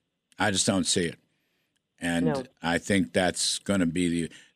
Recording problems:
none

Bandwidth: 14.5 kHz